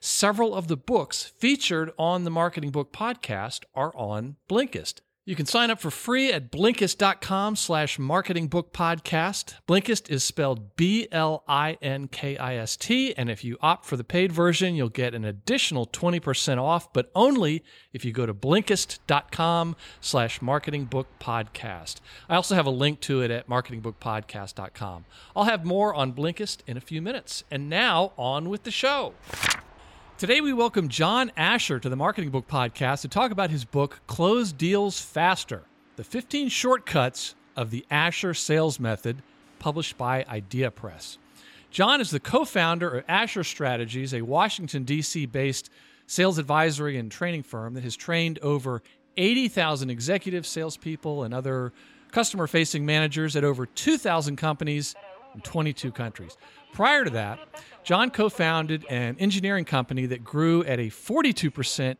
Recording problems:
train or aircraft noise; faint; from 19 s on; 30 dB below the speech

